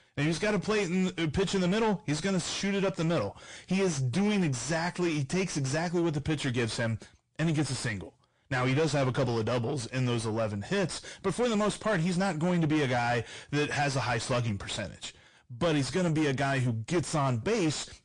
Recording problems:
distortion; heavy; 5 dB below the speech
garbled, watery; slightly; nothing above 9 kHz

